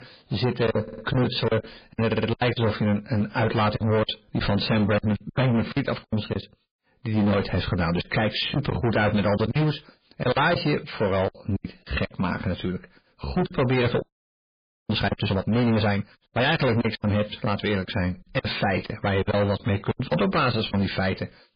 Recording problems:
distortion; heavy; 18% of the sound clipped
garbled, watery; badly; nothing above 5 kHz
choppy; very; 11% of the speech affected
audio stuttering; at 1 s and at 2 s
audio freezing; at 14 s for 1 s

